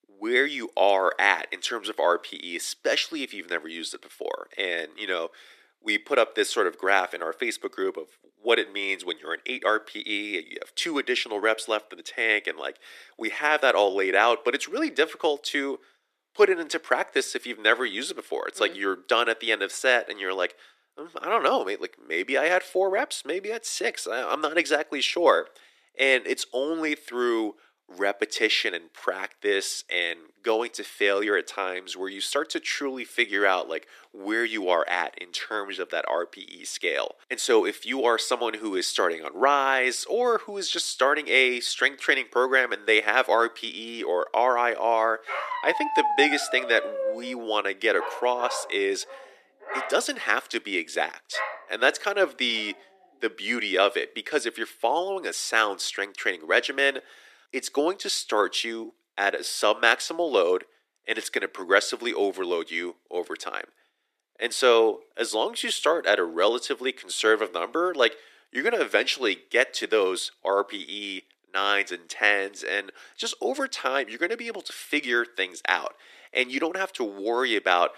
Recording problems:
thin; very; fading below 300 Hz
dog barking; loud; from 45 to 52 s; peak level with the speech

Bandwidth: 14 kHz